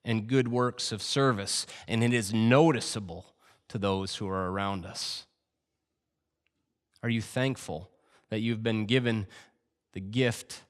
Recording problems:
none

